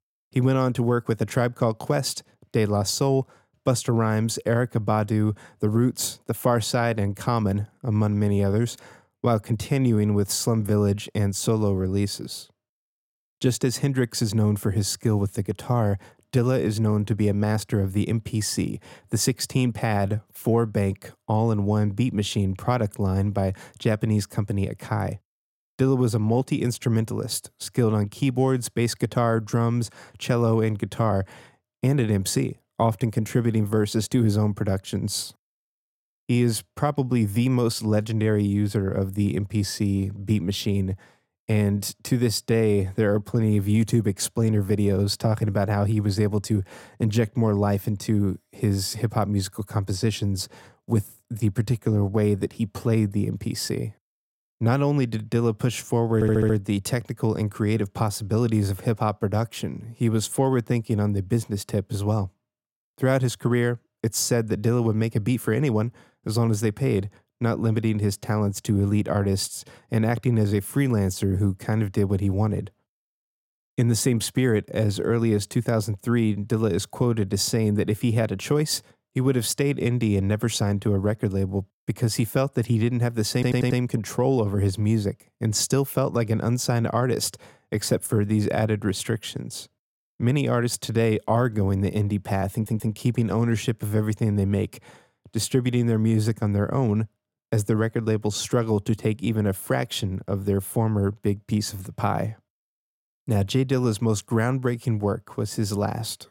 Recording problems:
audio stuttering; at 56 s, at 1:23 and at 1:33

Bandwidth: 16.5 kHz